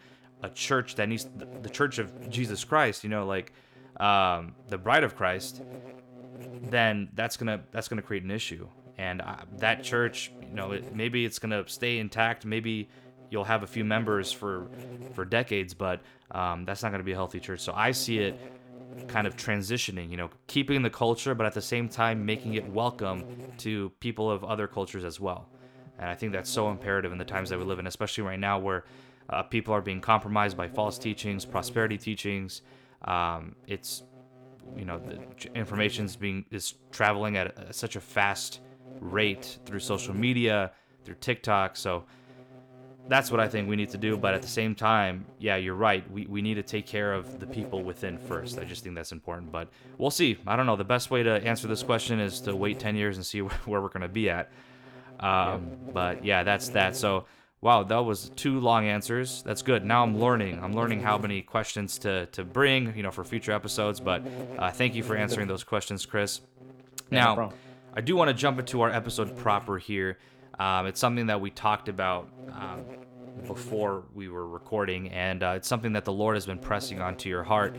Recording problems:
electrical hum; noticeable; throughout; 50 Hz, 20 dB below the speech

